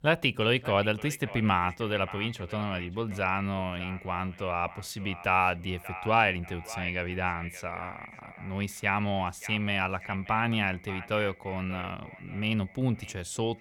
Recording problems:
echo of what is said; noticeable; throughout; 580 ms later, 15 dB below the speech

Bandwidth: 17 kHz